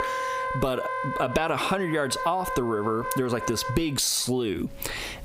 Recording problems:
squashed, flat; heavily, background pumping
background music; loud; throughout; 6 dB below the speech

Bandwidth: 15.5 kHz